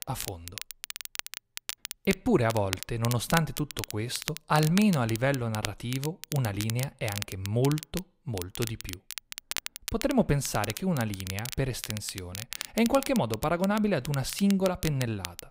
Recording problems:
crackle, like an old record; loud; 9 dB below the speech

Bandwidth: 15.5 kHz